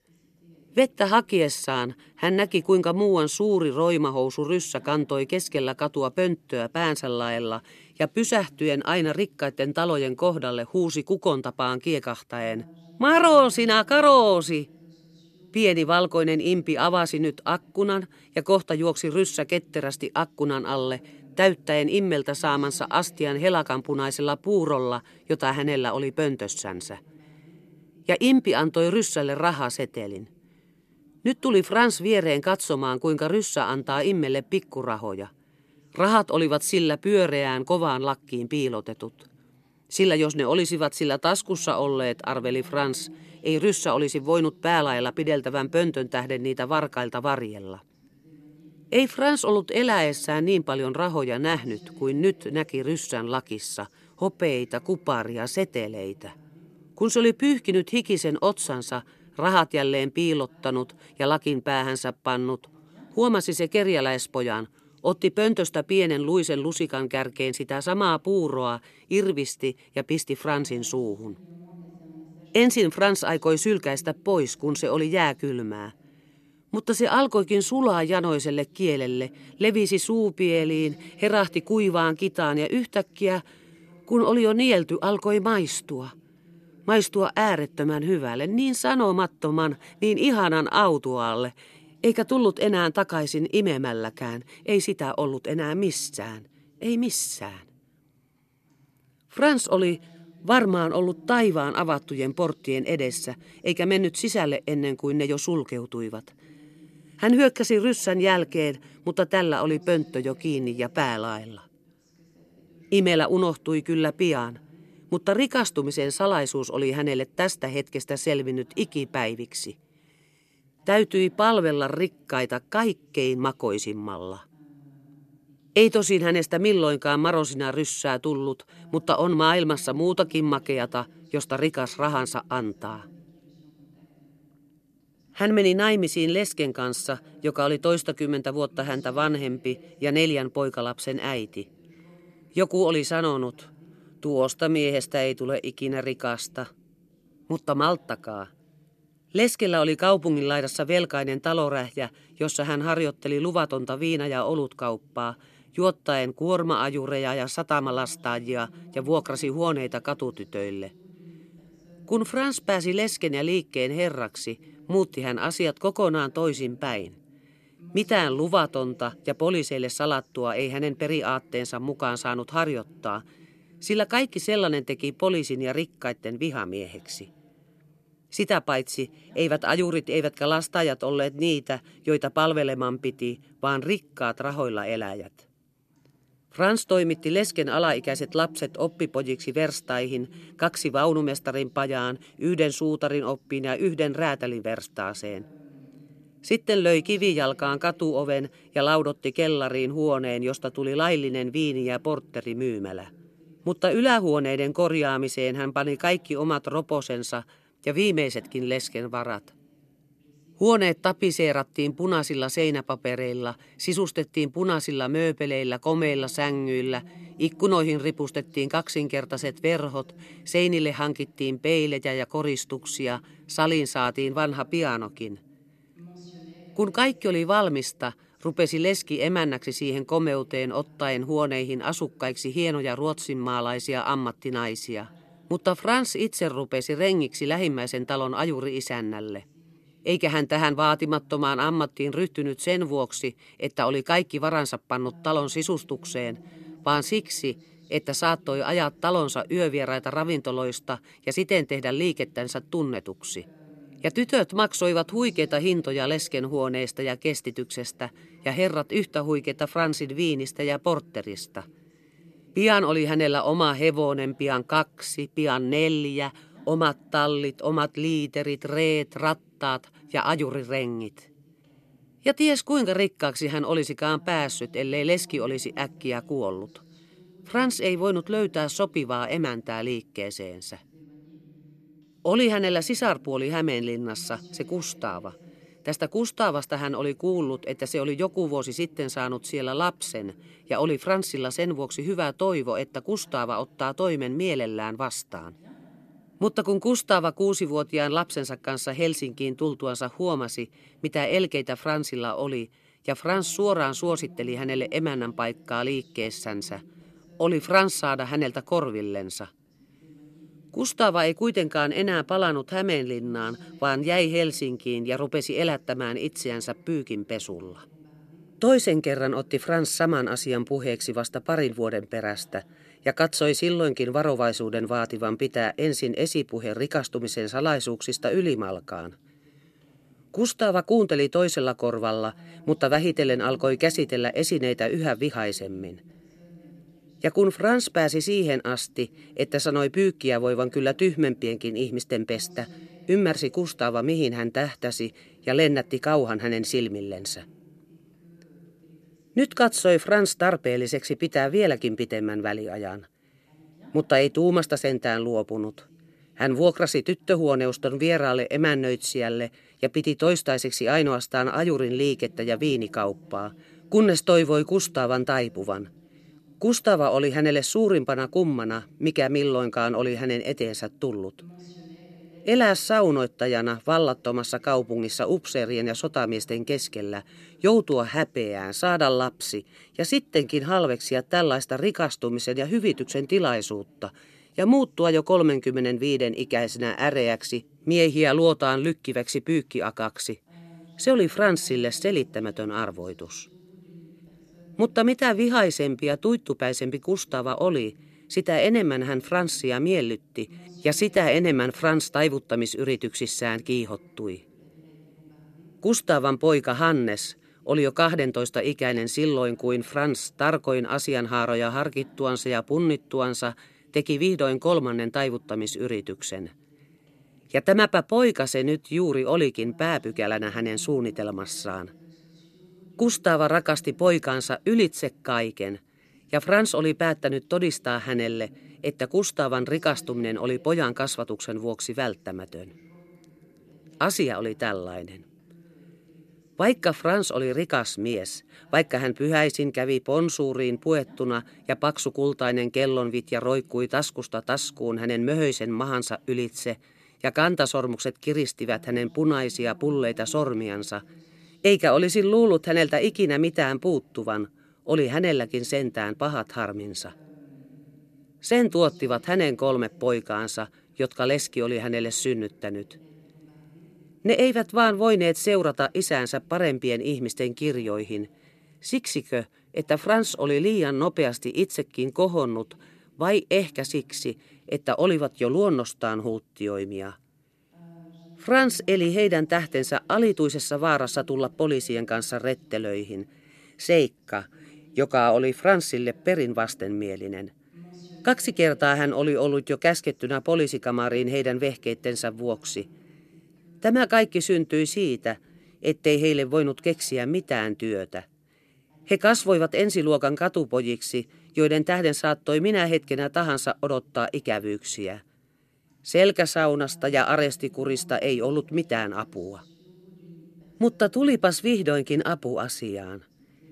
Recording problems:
voice in the background; faint; throughout; 30 dB below the speech

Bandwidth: 13.5 kHz